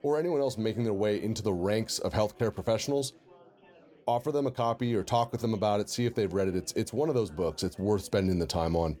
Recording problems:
chatter from many people; faint; throughout; 25 dB below the speech

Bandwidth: 18.5 kHz